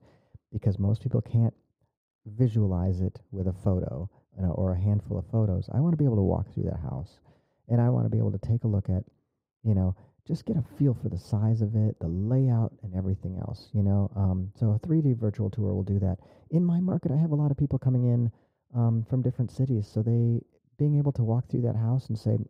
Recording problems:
muffled; very; fading above 1.5 kHz

